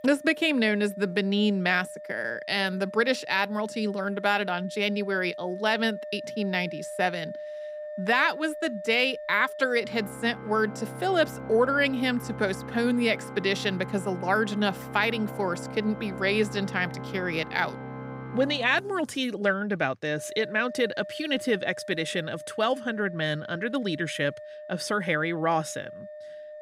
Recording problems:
background music; noticeable; throughout; 15 dB below the speech

